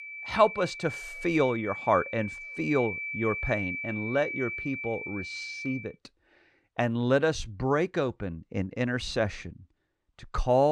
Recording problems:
high-pitched whine; loud; until 6 s; 2.5 kHz, 6 dB below the speech
abrupt cut into speech; at the end

